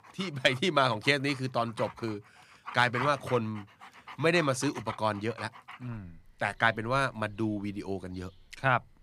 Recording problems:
animal sounds; noticeable; throughout; 15 dB below the speech

